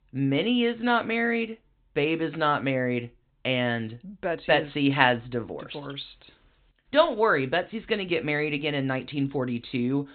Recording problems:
high frequencies cut off; severe; nothing above 4 kHz

